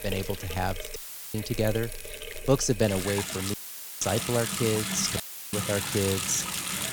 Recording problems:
household noises; loud; throughout; 3 dB below the speech
crackle, like an old record; noticeable; 20 dB below the speech
audio cutting out; filled with static; at 1 s, at 3.5 s and at 5 s

